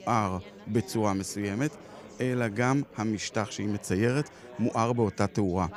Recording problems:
chatter from many people; noticeable; throughout; 20 dB below the speech

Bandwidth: 15 kHz